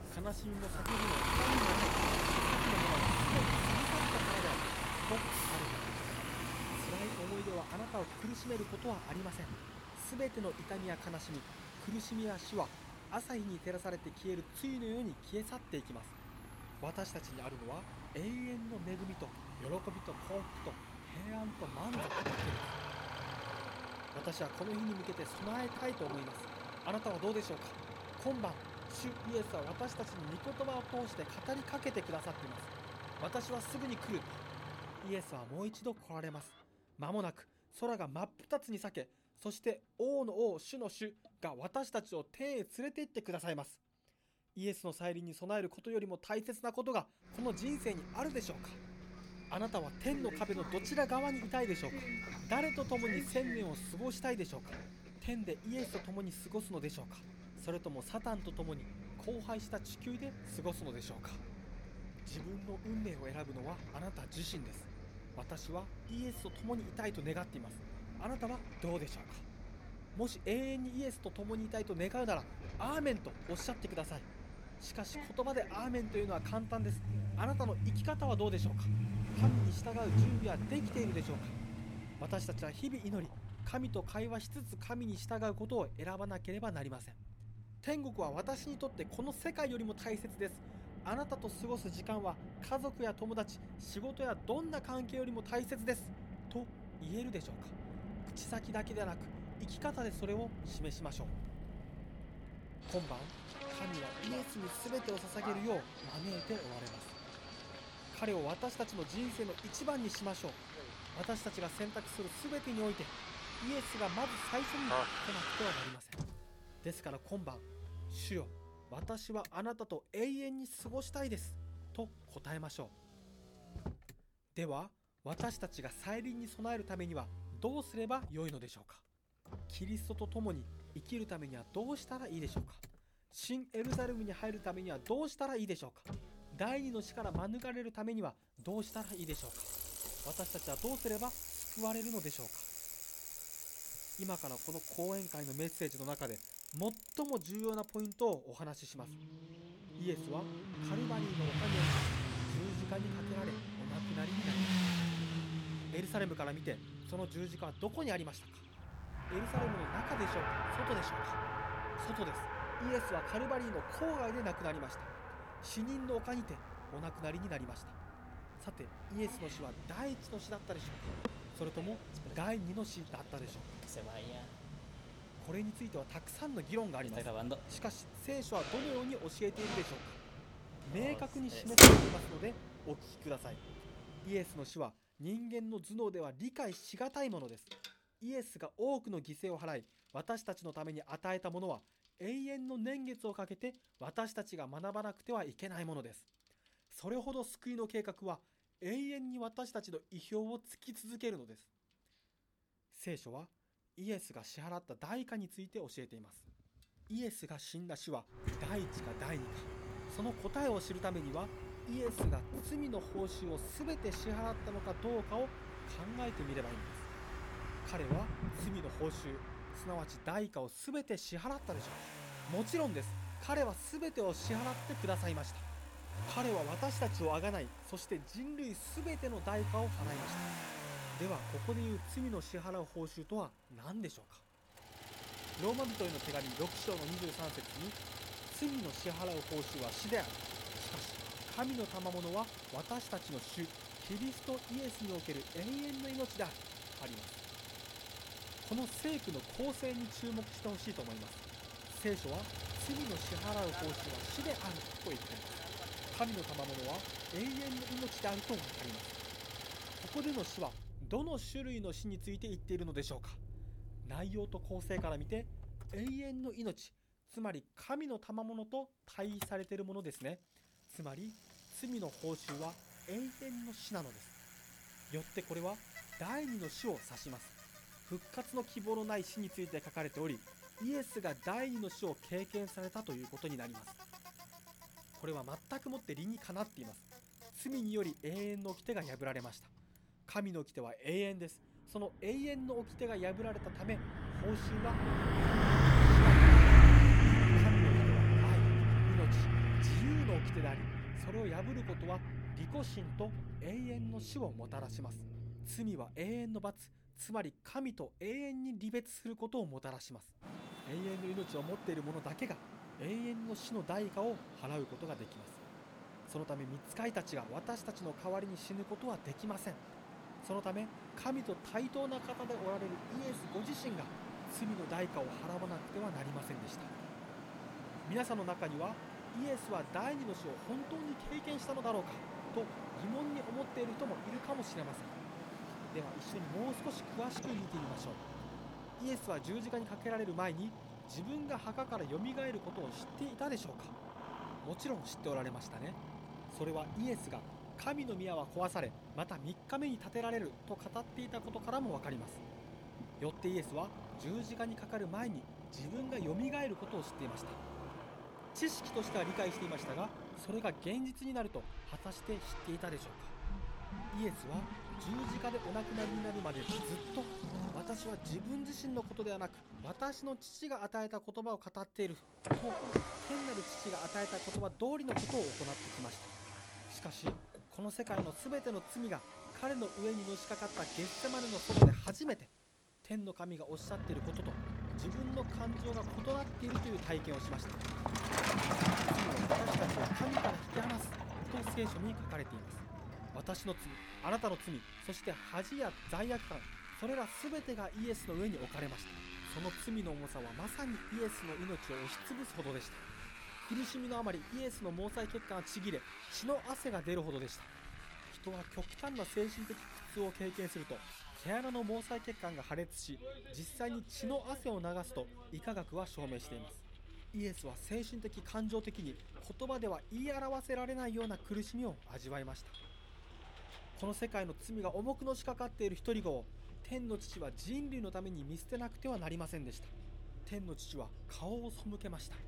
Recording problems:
traffic noise; very loud; throughout; 4 dB above the speech

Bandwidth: 18.5 kHz